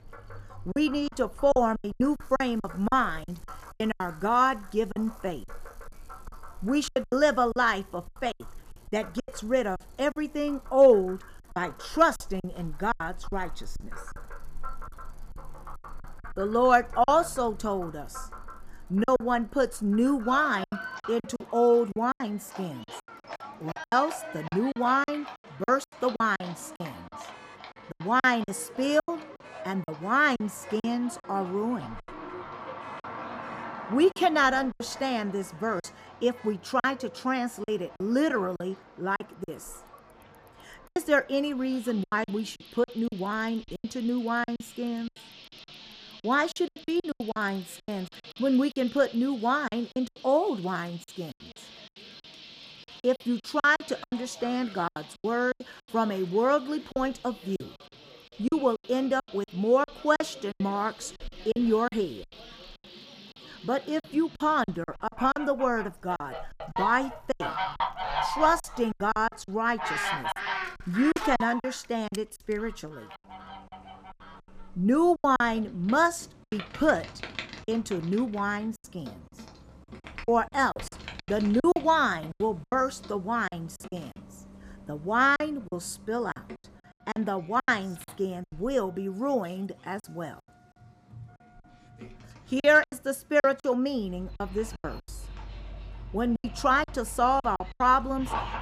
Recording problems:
animal sounds; noticeable; throughout; 15 dB below the speech
traffic noise; faint; throughout; 30 dB below the speech
choppy; very; 12% of the speech affected

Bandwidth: 15 kHz